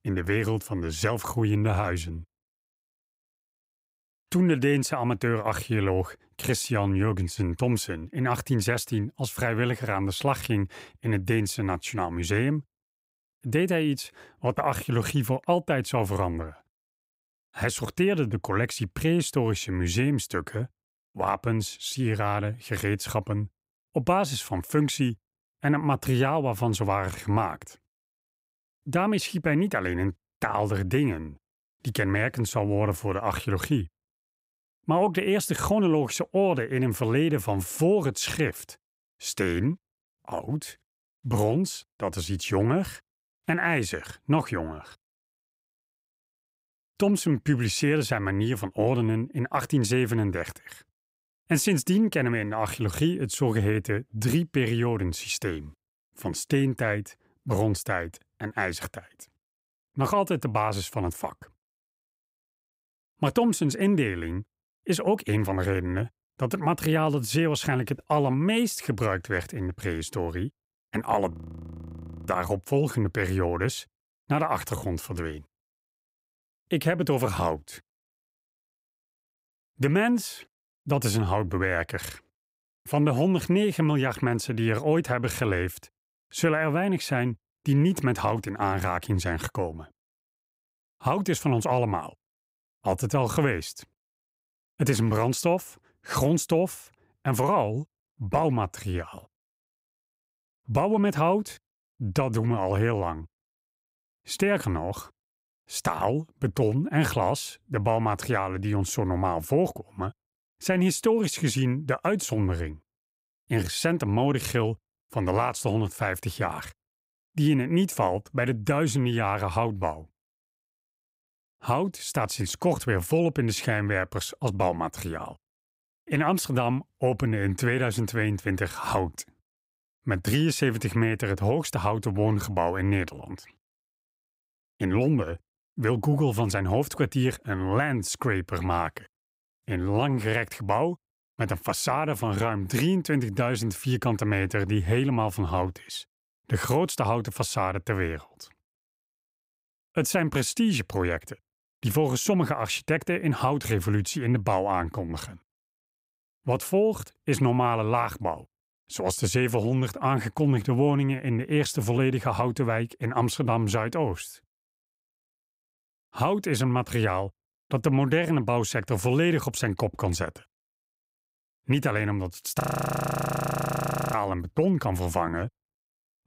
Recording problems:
audio freezing; at 1:11 for 1 s and at 2:53 for 1.5 s

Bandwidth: 15.5 kHz